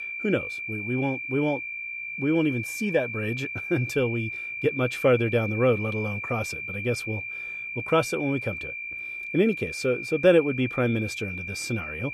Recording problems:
high-pitched whine; loud; throughout; 2.5 kHz, 6 dB below the speech

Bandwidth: 14 kHz